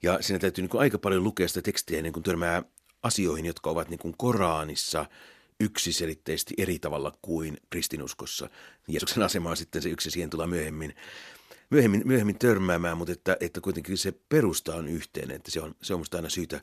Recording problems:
uneven, jittery; strongly; from 1.5 to 16 s

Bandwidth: 14 kHz